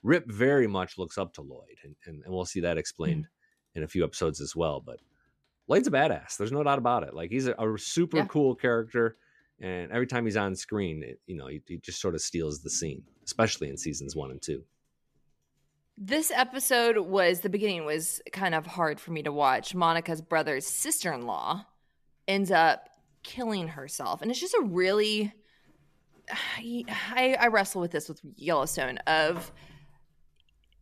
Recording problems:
household noises; faint; throughout; 30 dB below the speech

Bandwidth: 14 kHz